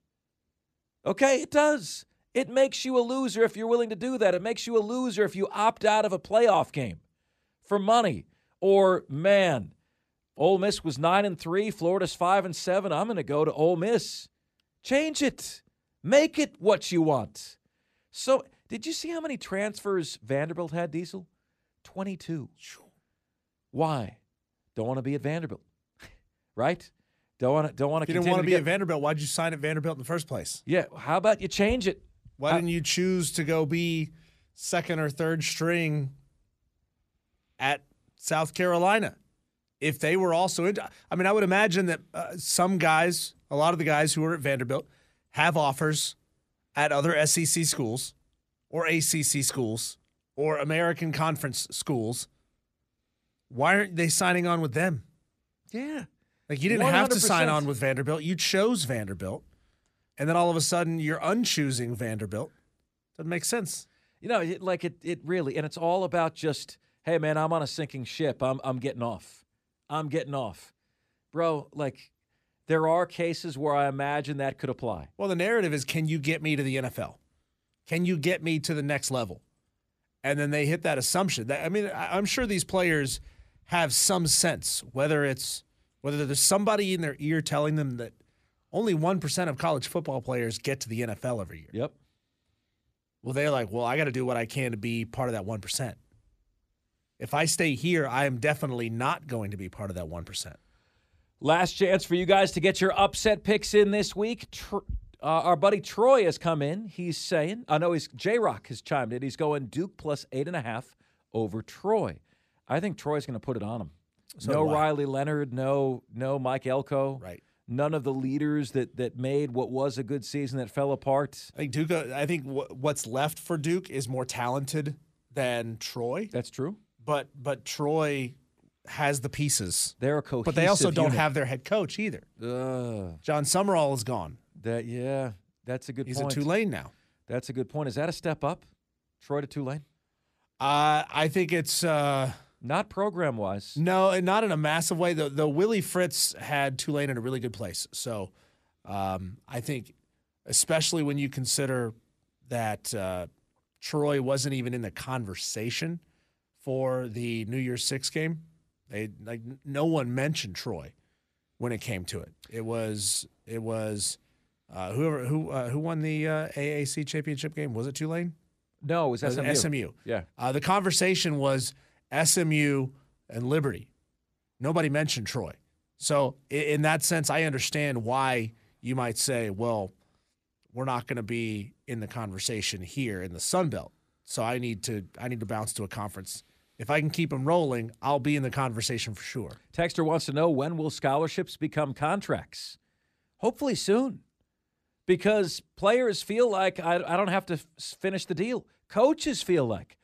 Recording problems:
none

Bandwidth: 14.5 kHz